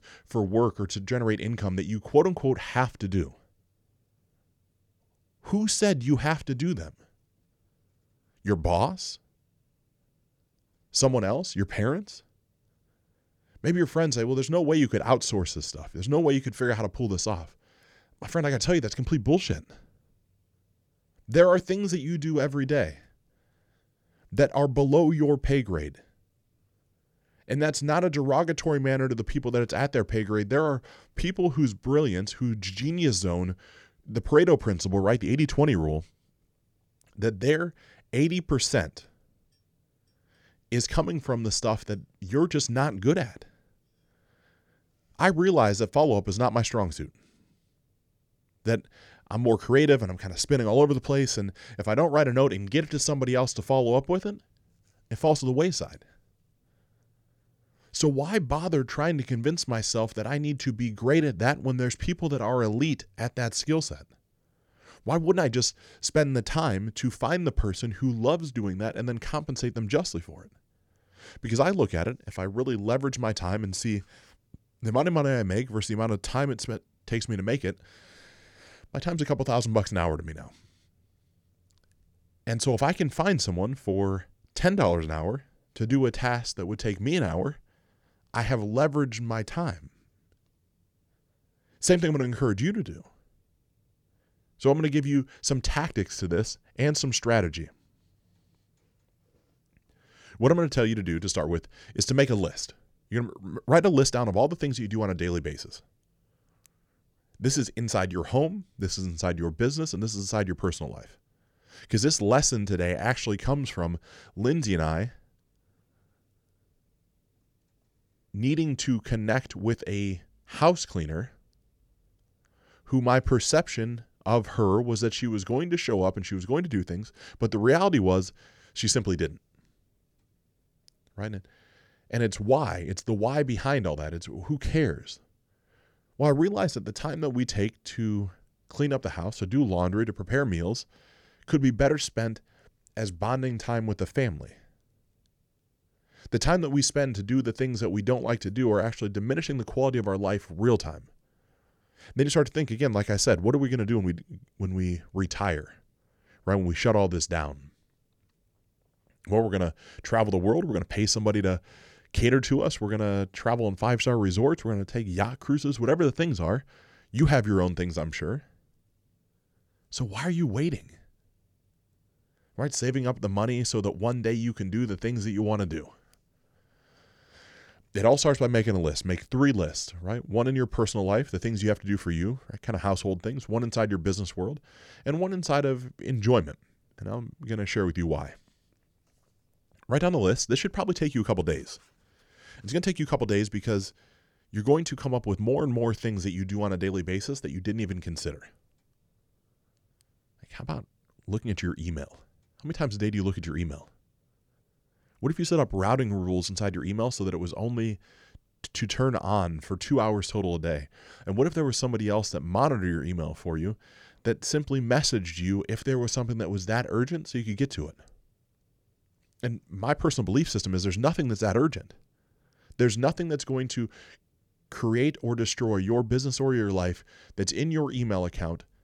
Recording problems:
none

